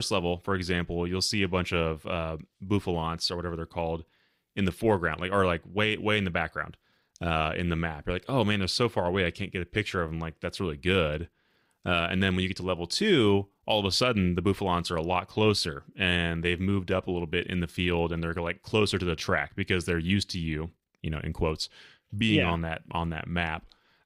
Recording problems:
abrupt cut into speech; at the start

